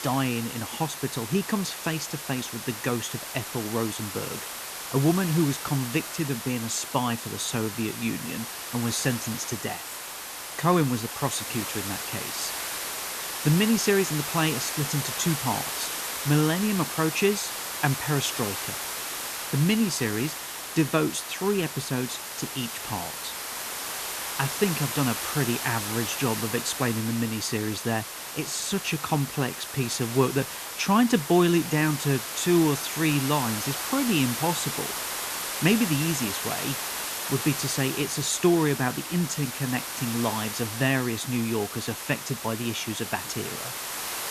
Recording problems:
hiss; loud; throughout; 4 dB below the speech

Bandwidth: 14 kHz